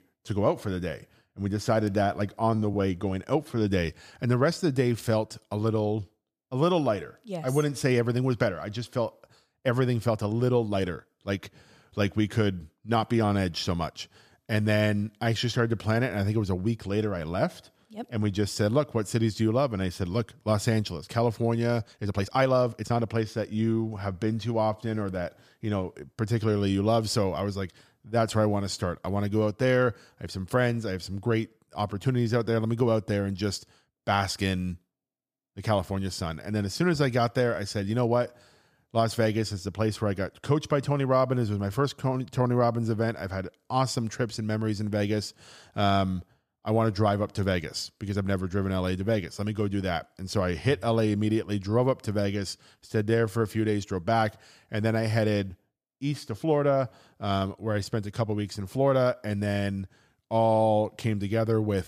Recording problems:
uneven, jittery; strongly; from 2.5 to 53 s

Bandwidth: 15 kHz